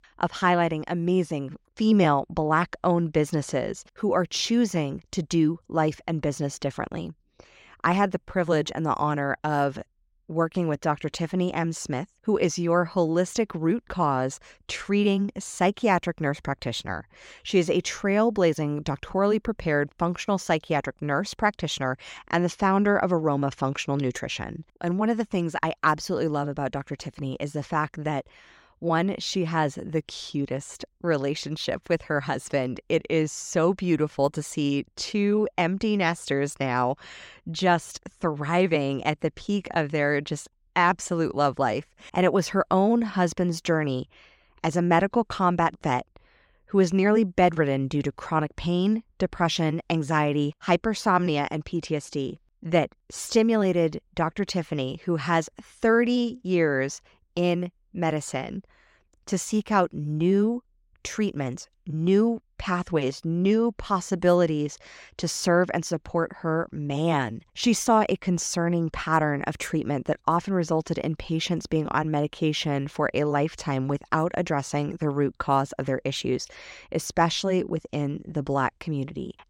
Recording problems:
none

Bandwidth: 16 kHz